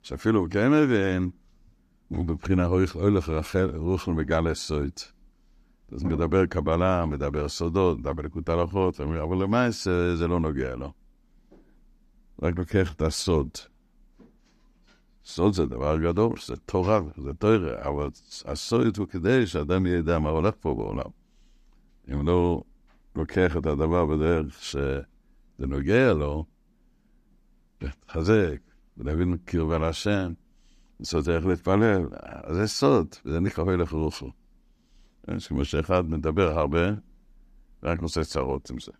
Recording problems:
none

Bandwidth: 14.5 kHz